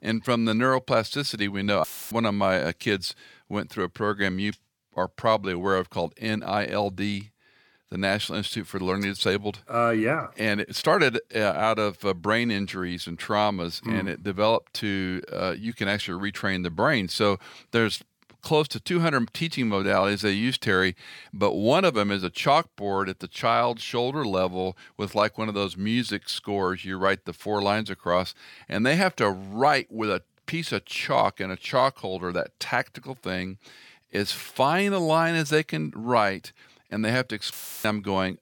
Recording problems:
audio cutting out; filled with static; at 2 s and at 38 s

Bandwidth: 17.5 kHz